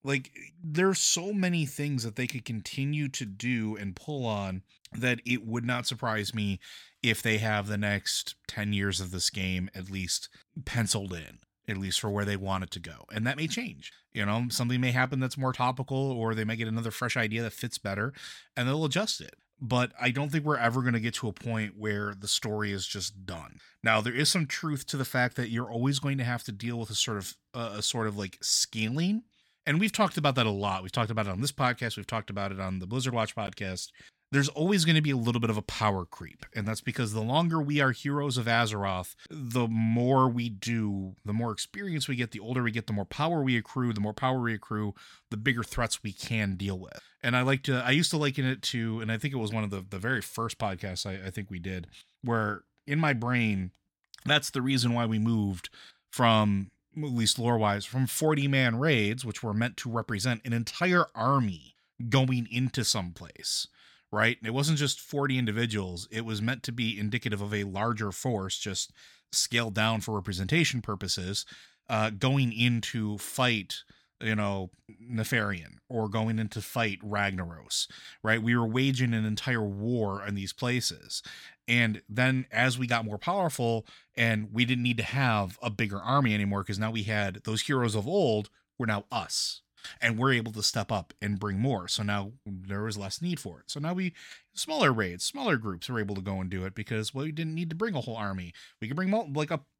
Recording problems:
none

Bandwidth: 17 kHz